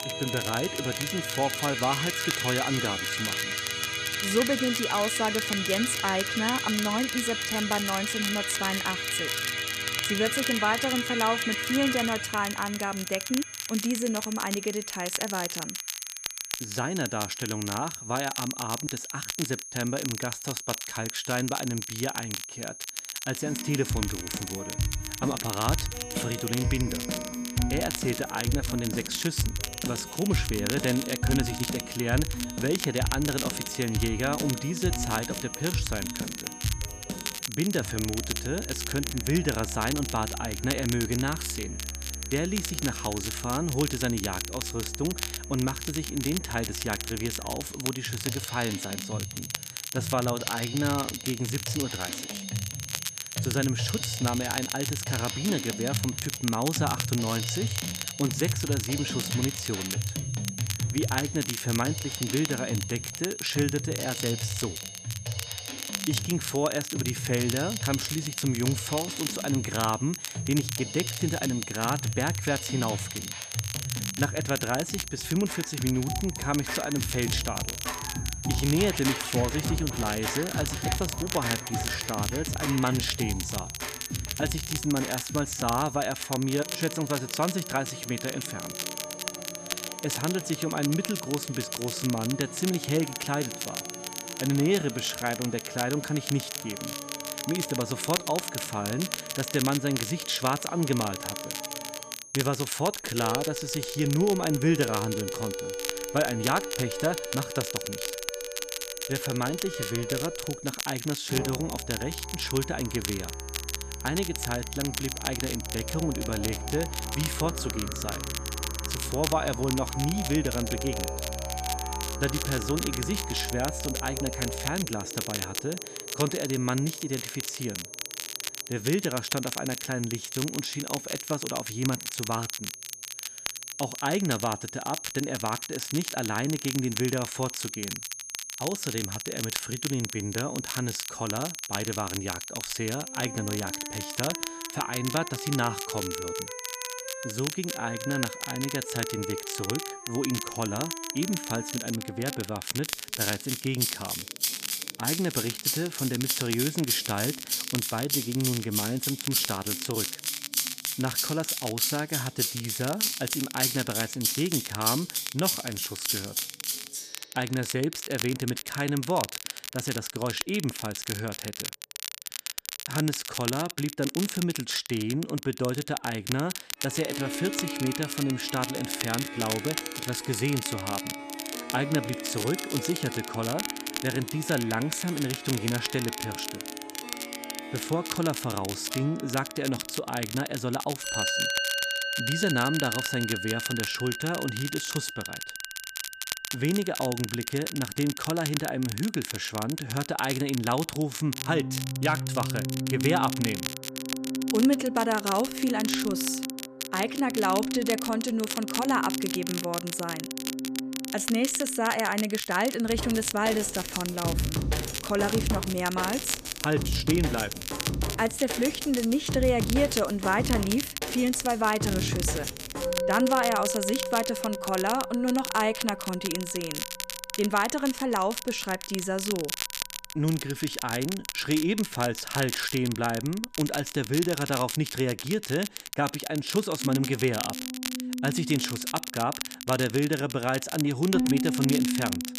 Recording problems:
background music; loud; throughout; 4 dB below the speech
crackle, like an old record; loud; 5 dB below the speech
high-pitched whine; noticeable; until 2:32; 6.5 kHz, 10 dB below the speech

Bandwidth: 14.5 kHz